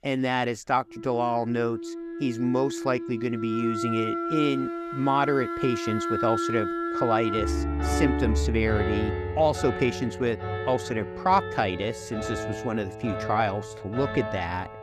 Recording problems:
background music; loud; throughout; 3 dB below the speech

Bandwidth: 14.5 kHz